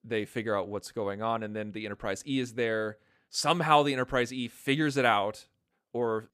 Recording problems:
none

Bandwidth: 15 kHz